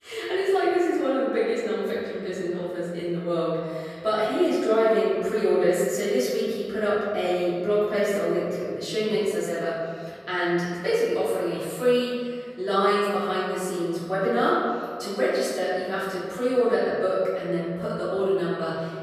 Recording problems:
room echo; strong; dies away in 2 s
off-mic speech; far

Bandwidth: 14.5 kHz